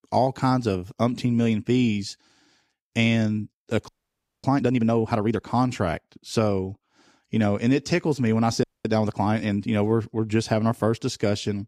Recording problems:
audio freezing; at 4 s for 0.5 s and at 8.5 s

